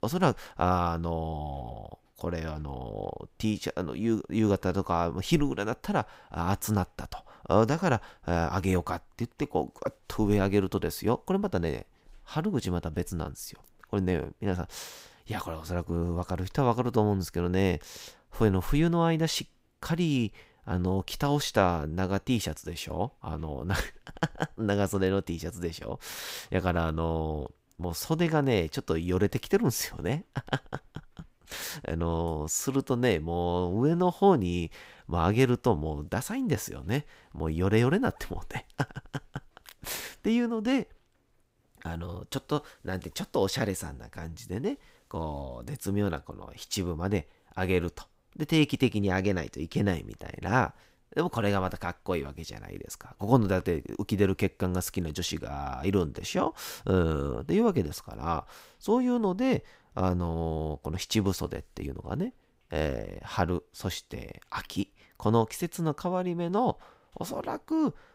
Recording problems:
none

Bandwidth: 15.5 kHz